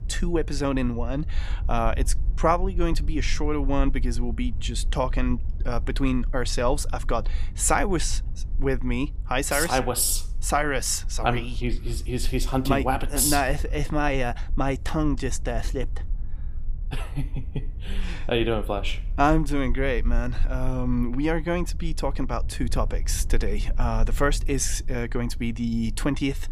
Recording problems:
low rumble; faint; throughout; 25 dB below the speech

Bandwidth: 15 kHz